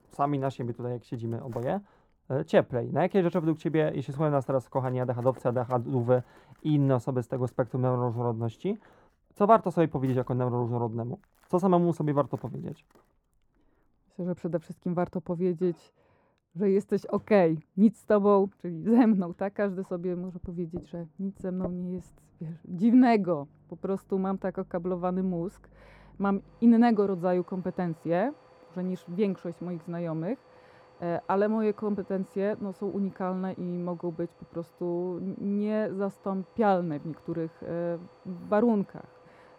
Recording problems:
muffled; very; fading above 2 kHz
household noises; faint; throughout; 25 dB below the speech

